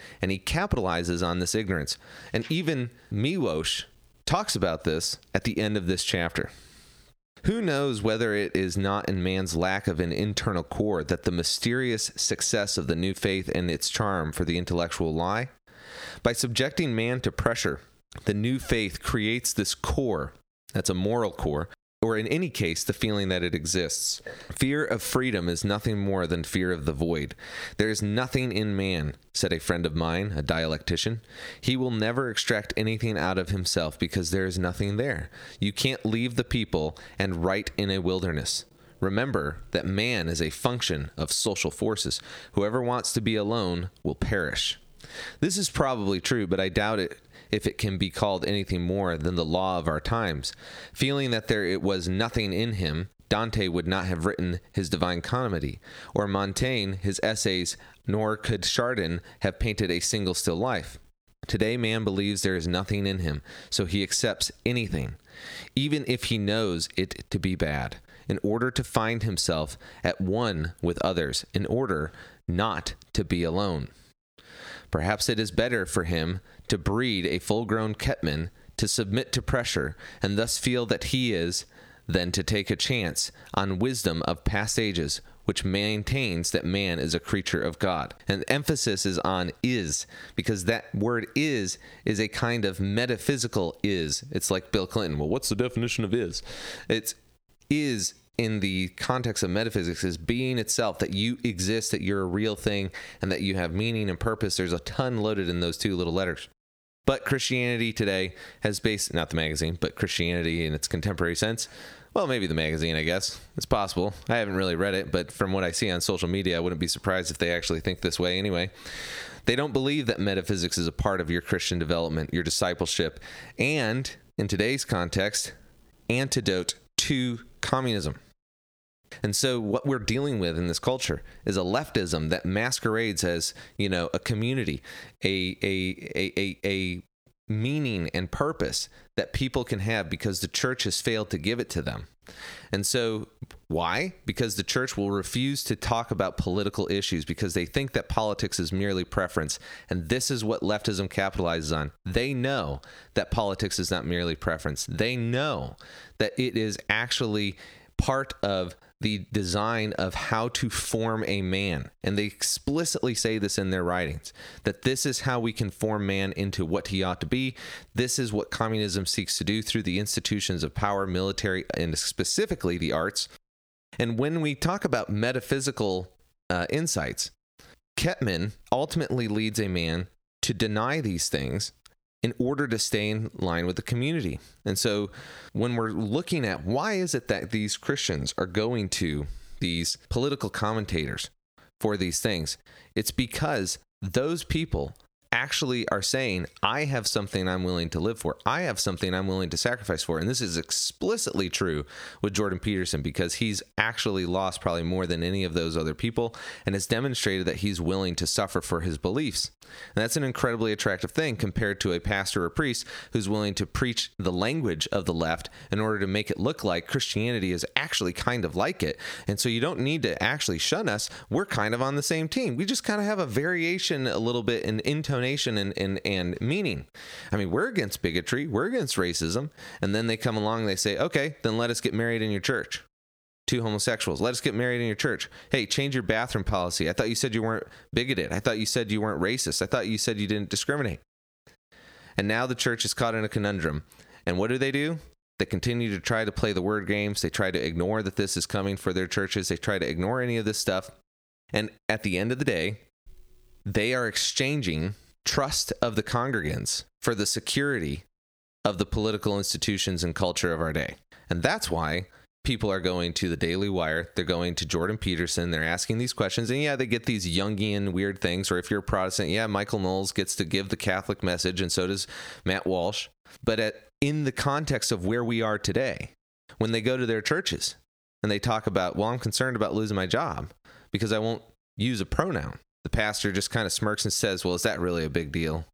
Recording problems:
squashed, flat; heavily

